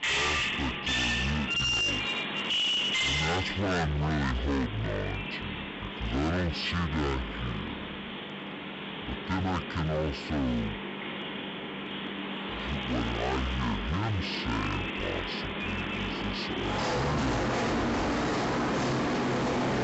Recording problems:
distortion; heavy; 22% of the sound clipped
wrong speed and pitch; too slow and too low; 0.5 times normal speed
animal sounds; very loud; throughout; 1 dB above the speech

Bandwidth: 8 kHz